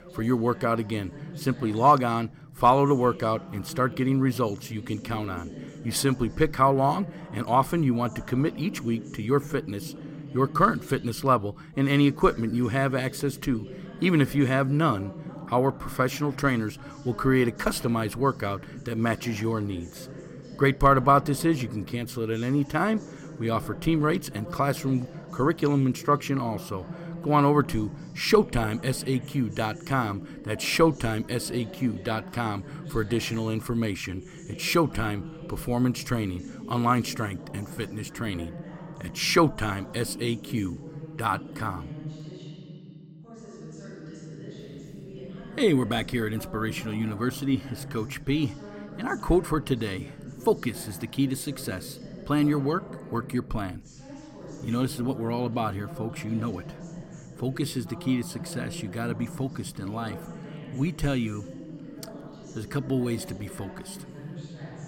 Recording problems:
voice in the background; noticeable; throughout; 15 dB below the speech

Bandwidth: 16.5 kHz